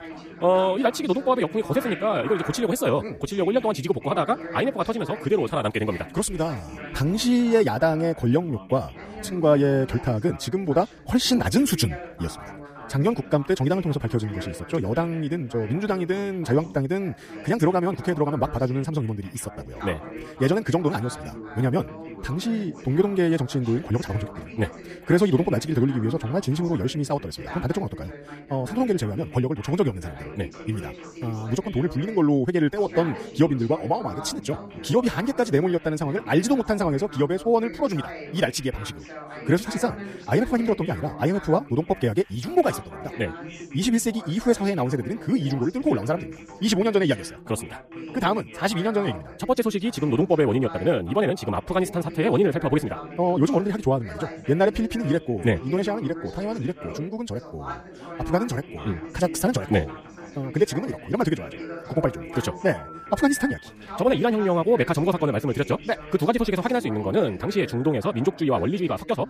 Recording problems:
wrong speed, natural pitch; too fast; 1.7 times normal speed
background chatter; noticeable; throughout; 2 voices, 15 dB below the speech
phone ringing; noticeable; from 1:02 to 1:04; peak 7 dB below the speech

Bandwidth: 15 kHz